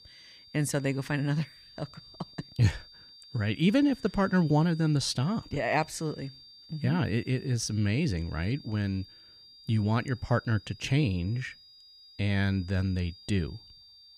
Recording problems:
high-pitched whine; faint; throughout; 4.5 kHz, 20 dB below the speech

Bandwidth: 15 kHz